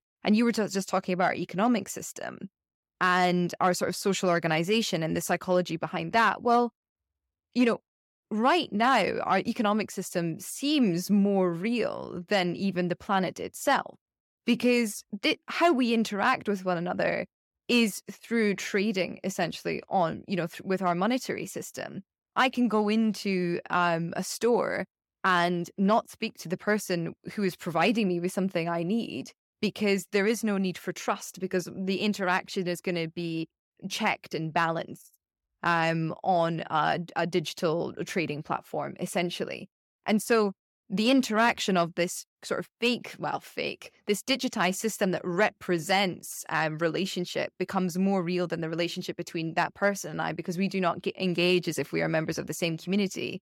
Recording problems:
none

